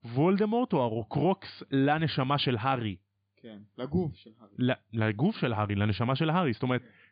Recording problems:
high frequencies cut off; severe; nothing above 5 kHz

